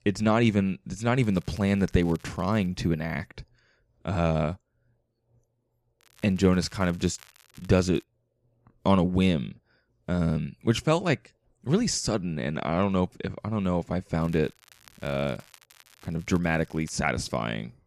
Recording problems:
crackling; faint; from 1 to 2.5 s, from 6 to 8 s and from 14 to 17 s; 25 dB below the speech

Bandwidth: 14 kHz